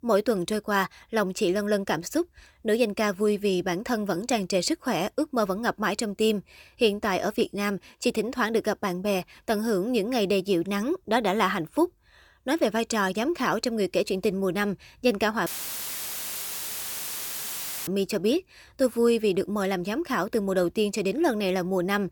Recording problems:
audio cutting out; filled with static; at 15 s for 2.5 s

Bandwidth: 18.5 kHz